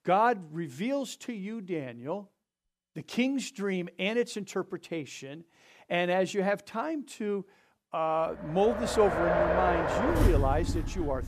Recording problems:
traffic noise; very faint; from 9 s on; 2 dB above the speech

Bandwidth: 14.5 kHz